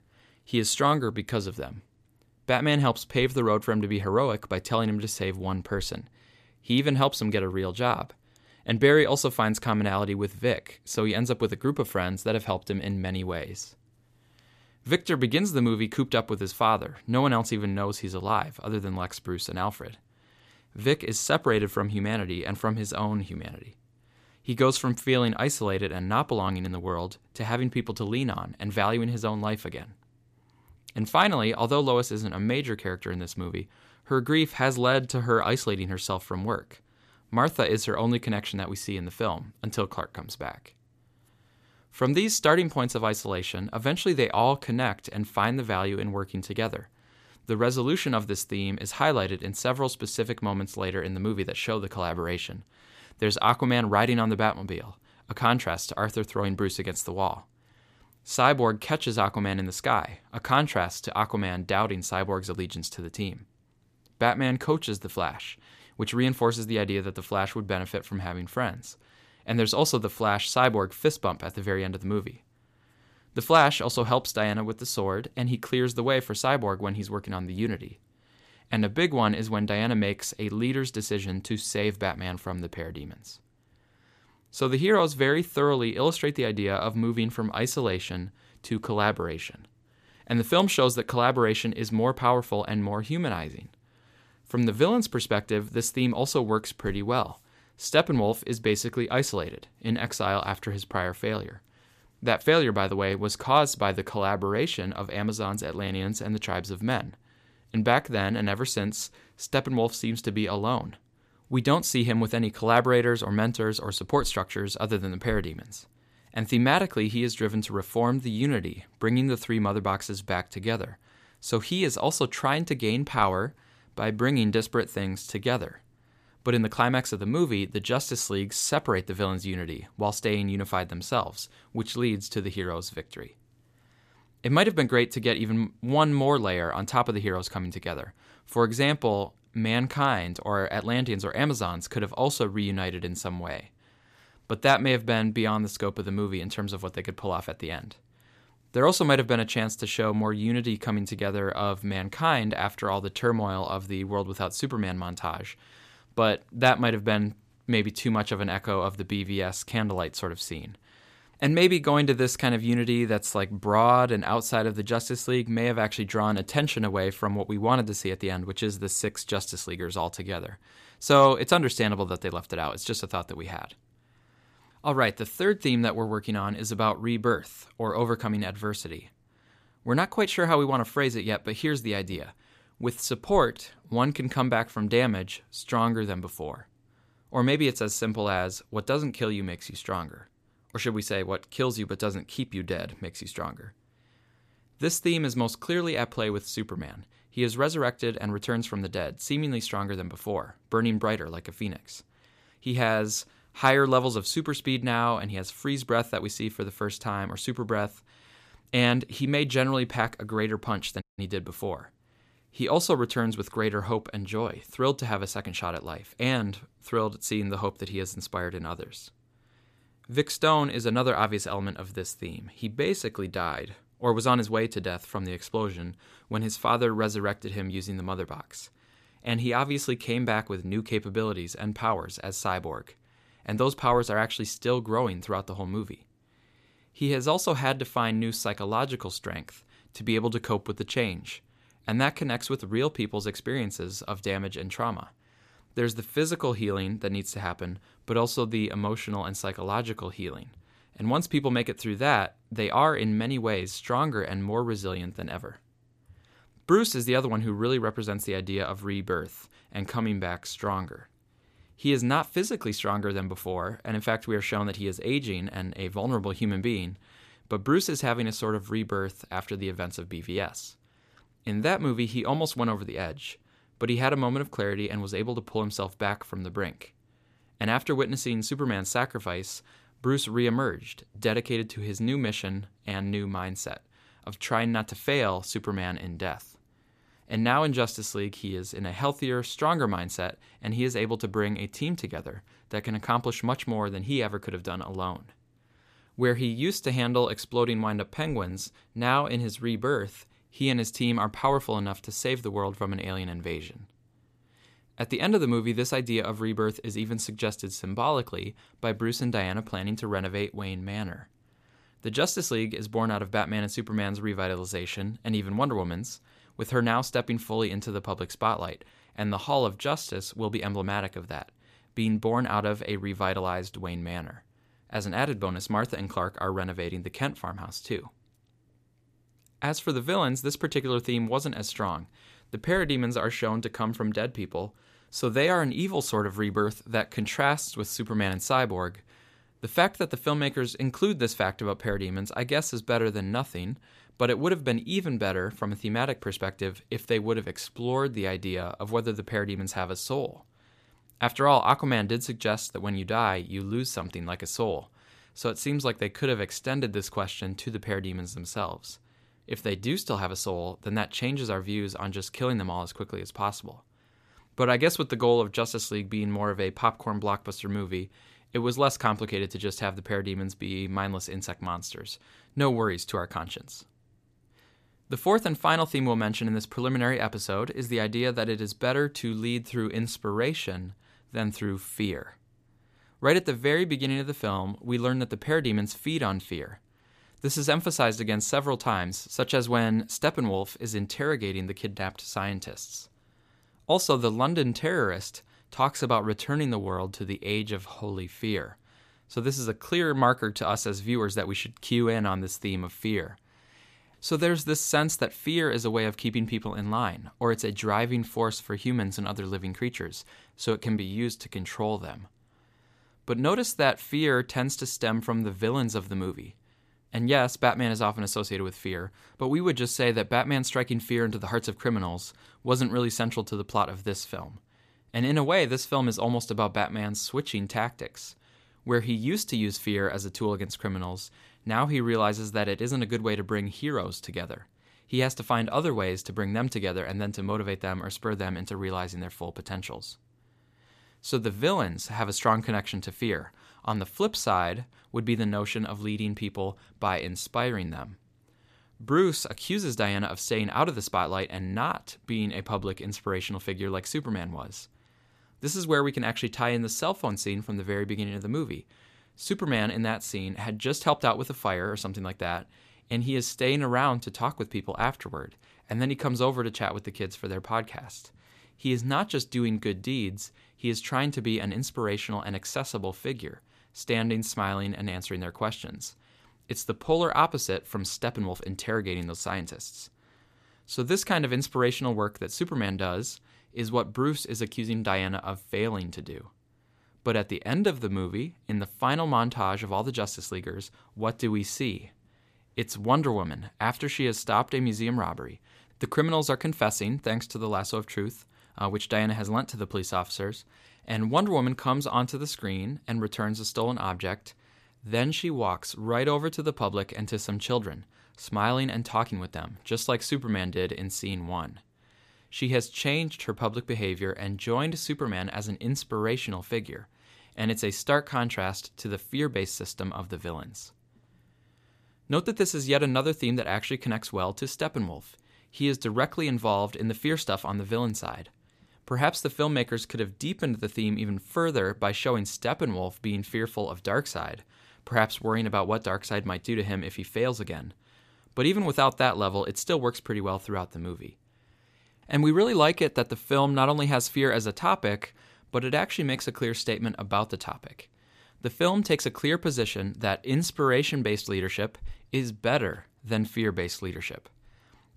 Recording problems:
audio cutting out; at 3:31

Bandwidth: 14.5 kHz